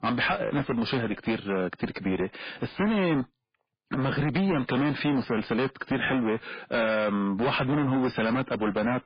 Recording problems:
distortion; heavy; 21% of the sound clipped
garbled, watery; badly; nothing above 5 kHz

